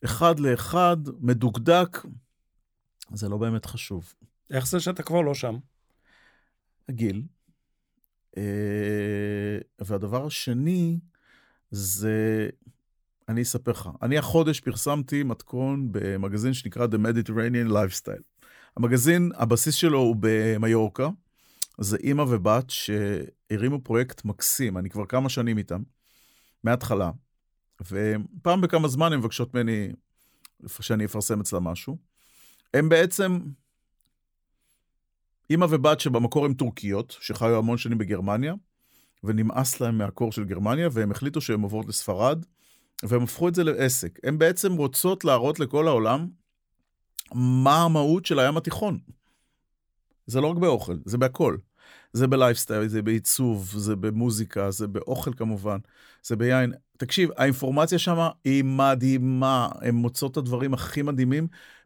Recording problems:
none

